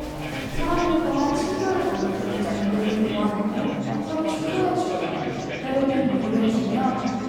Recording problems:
room echo; strong; dies away in 2.2 s
off-mic speech; far
chatter from many people; loud; throughout; 5 dB below the speech
background music; noticeable; throughout; 15 dB below the speech

